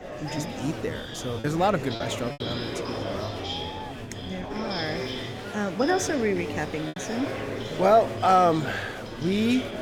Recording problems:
murmuring crowd; loud; throughout; 7 dB below the speech
choppy; occasionally; from 1.5 to 2.5 s and at 7 s; 4% of the speech affected

